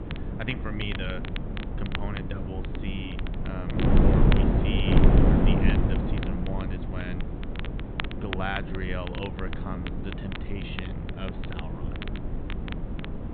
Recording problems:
high frequencies cut off; severe; nothing above 4 kHz
wind noise on the microphone; heavy; 2 dB above the speech
crackle, like an old record; loud; 6 dB below the speech

